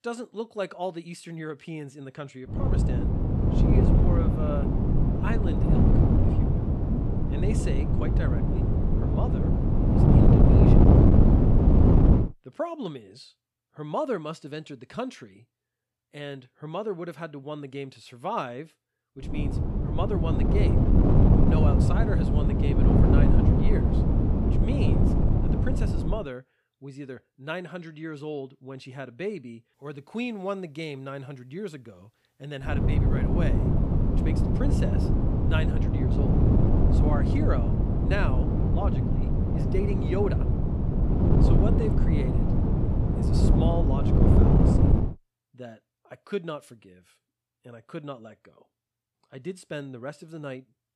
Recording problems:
wind noise on the microphone; heavy; from 2.5 to 12 s, from 19 to 26 s and from 33 to 45 s; 4 dB above the speech

